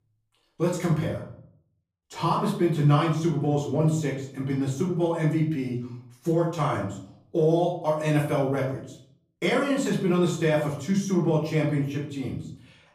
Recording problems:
off-mic speech; far
room echo; slight; dies away in 0.5 s

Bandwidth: 15 kHz